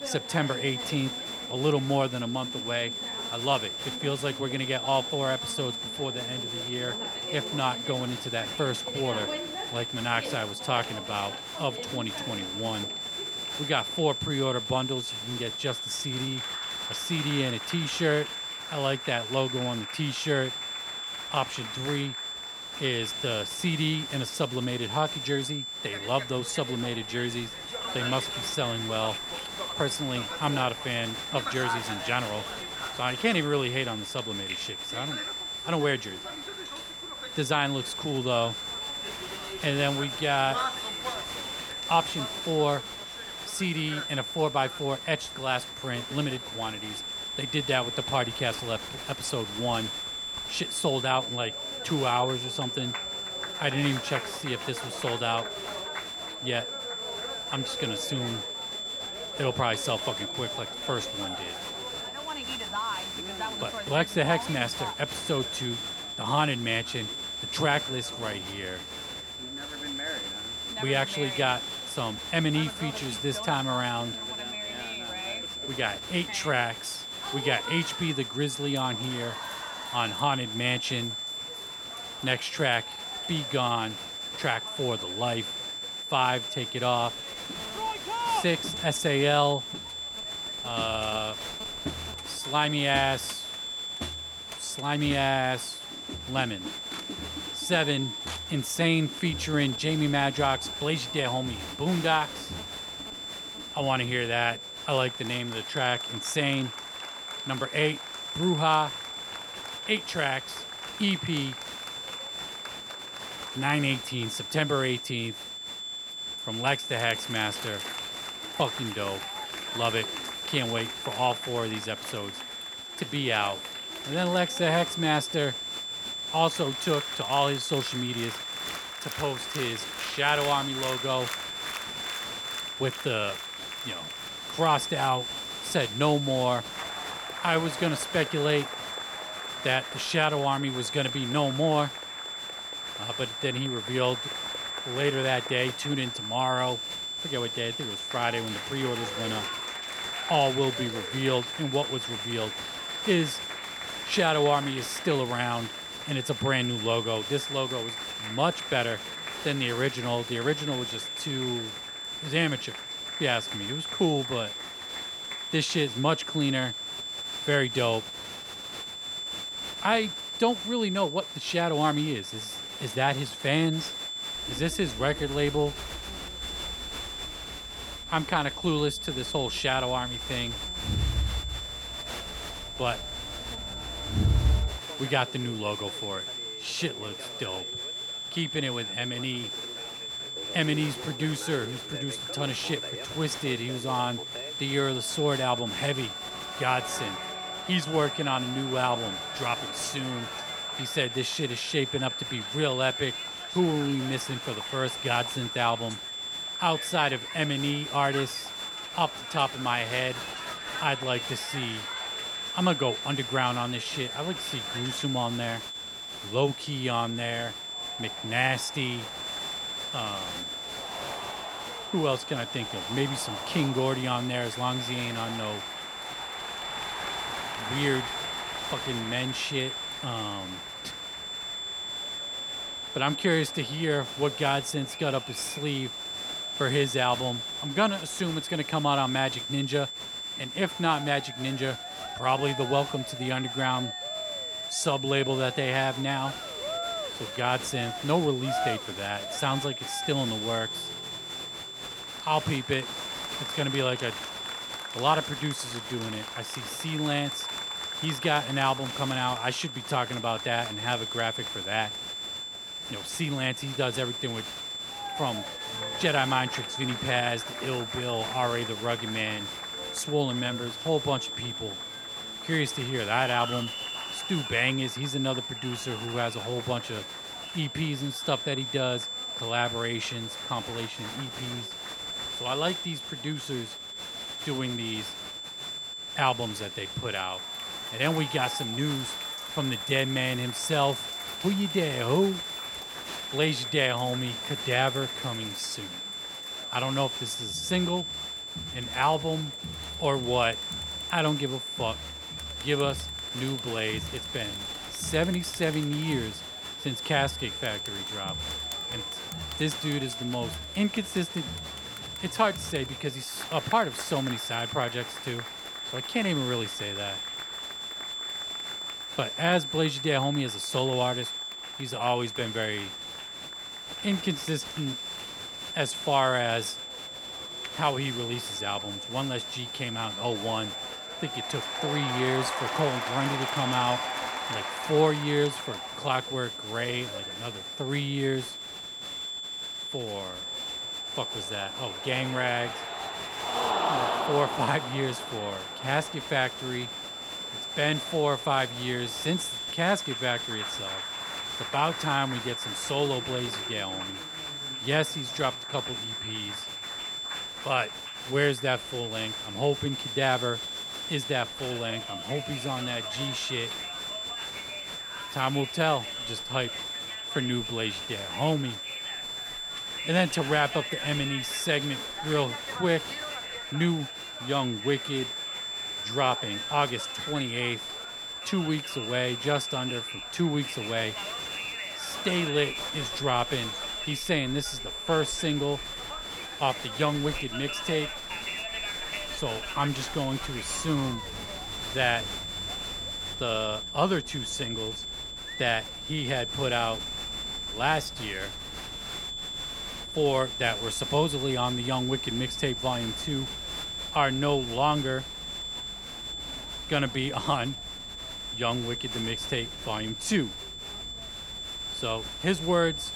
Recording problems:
high-pitched whine; loud; throughout; 3.5 kHz, 5 dB below the speech
crowd noise; noticeable; throughout; 10 dB below the speech

